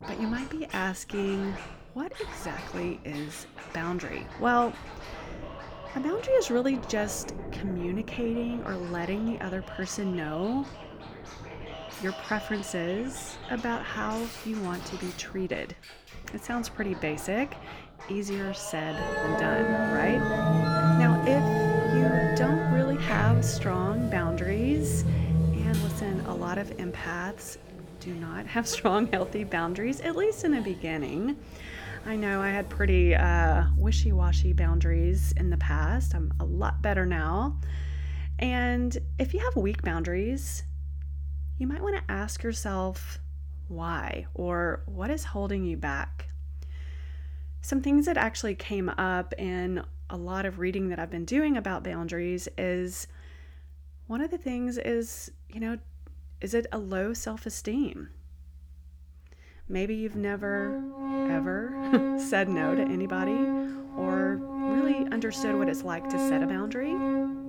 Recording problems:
background music; very loud; throughout; as loud as the speech

